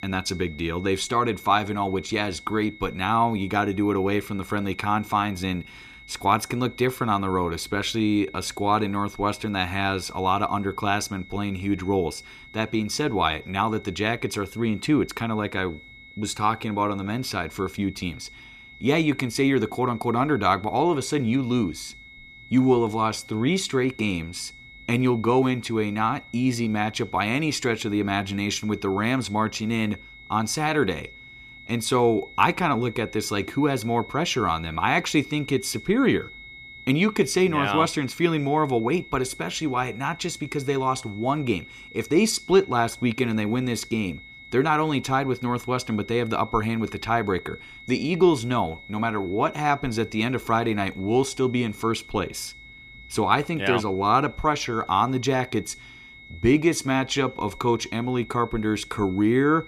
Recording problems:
high-pitched whine; noticeable; throughout; 2 kHz, 20 dB below the speech

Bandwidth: 14.5 kHz